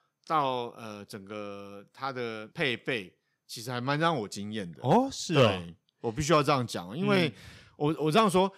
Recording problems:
none

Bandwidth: 15.5 kHz